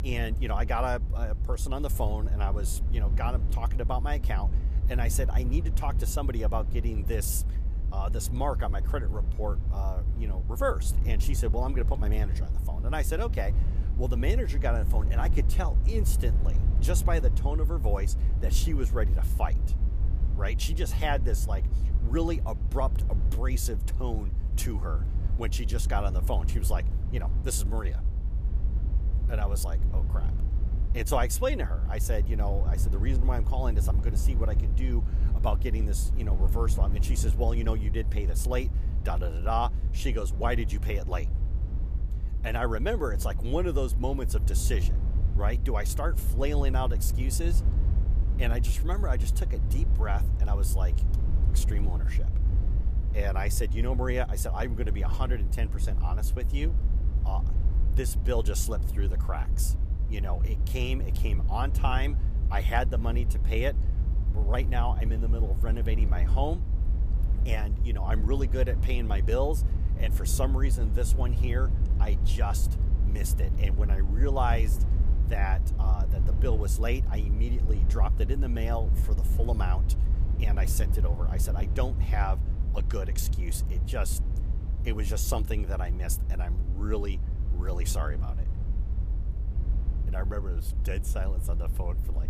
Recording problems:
low rumble; noticeable; throughout; 10 dB below the speech

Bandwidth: 14.5 kHz